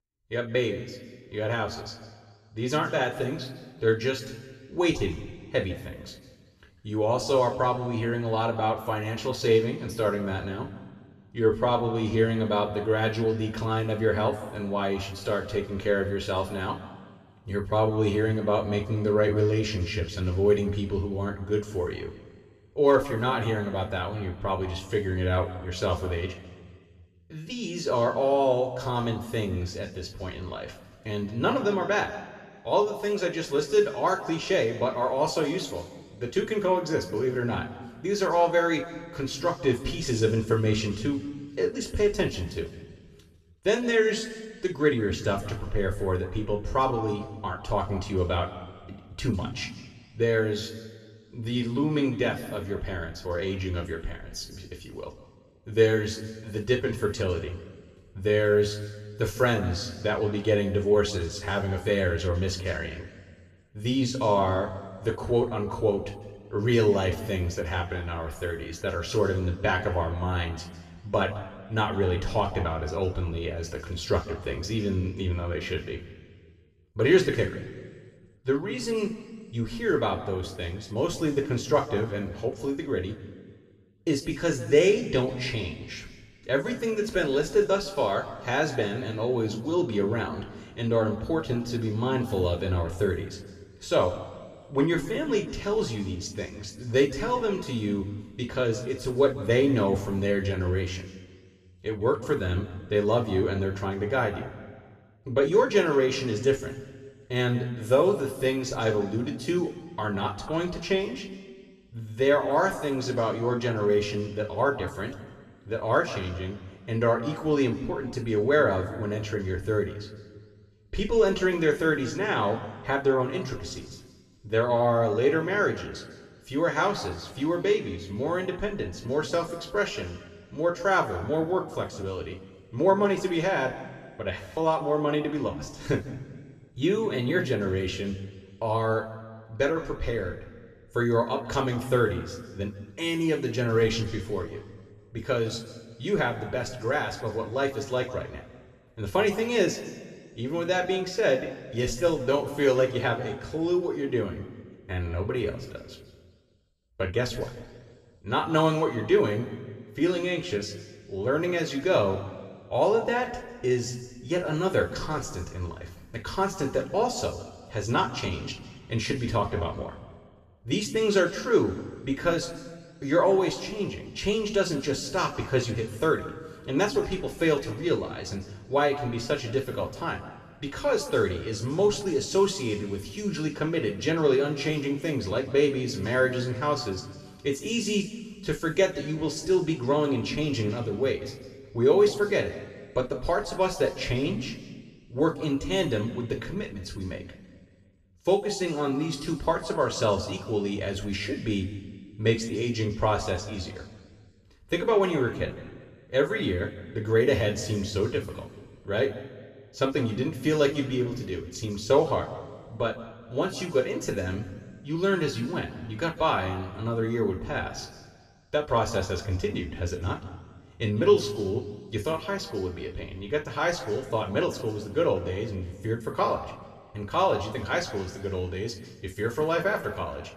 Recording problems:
room echo; noticeable; dies away in 1.3 s
off-mic speech; somewhat distant

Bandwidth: 14 kHz